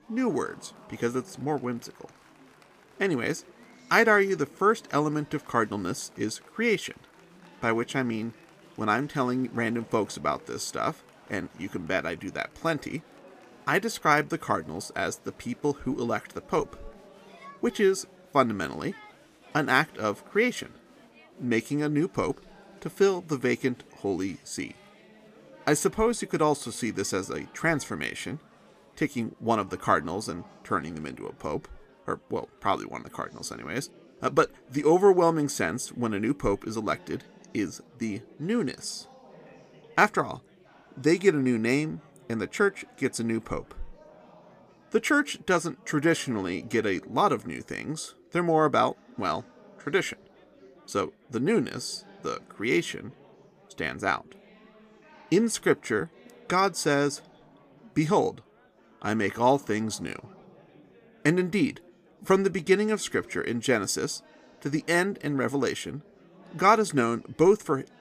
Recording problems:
chatter from many people; faint; throughout; 25 dB below the speech

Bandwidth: 15 kHz